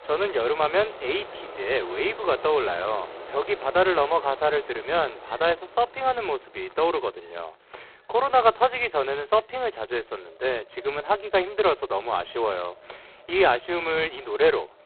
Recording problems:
phone-call audio; poor line; nothing above 4 kHz
wind in the background; noticeable; throughout; 20 dB below the speech

